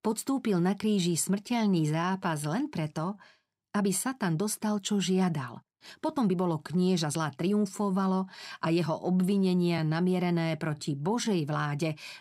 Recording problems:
uneven, jittery; strongly; from 1 to 11 s

